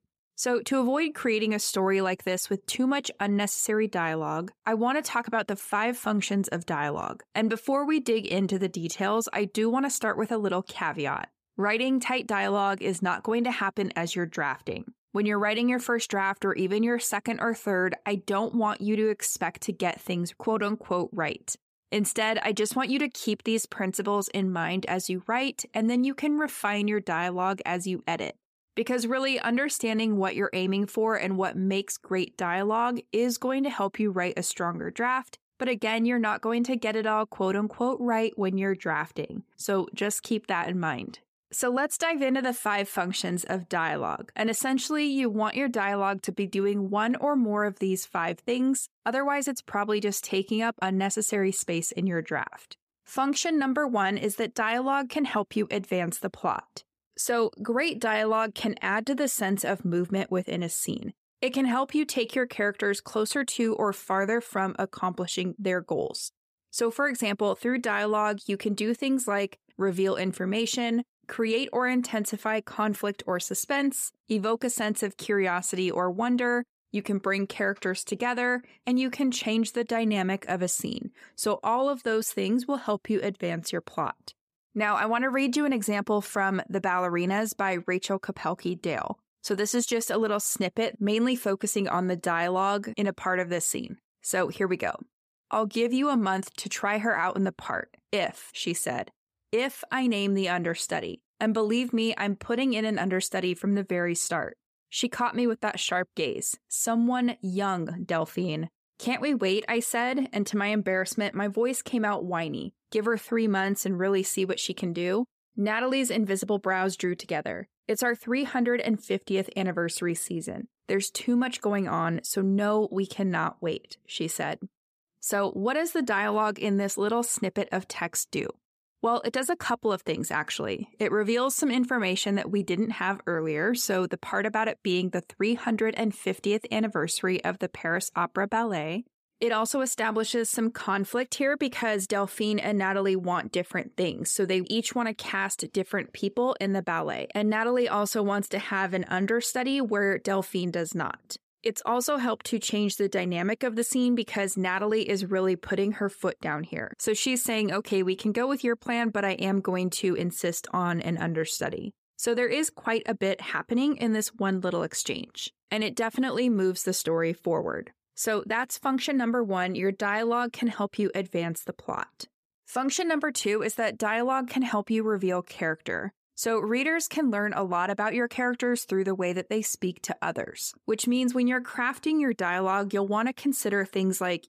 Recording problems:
none

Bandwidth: 15 kHz